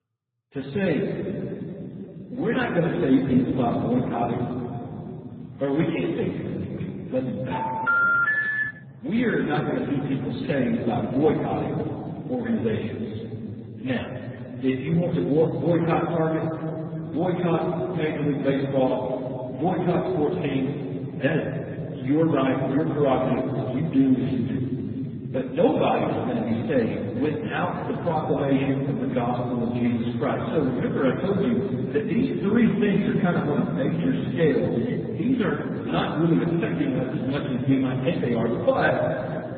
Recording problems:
garbled, watery; badly; nothing above 4 kHz
room echo; noticeable; dies away in 3 s
off-mic speech; somewhat distant
phone ringing; loud; from 7.5 to 9 s; peak 4 dB above the speech

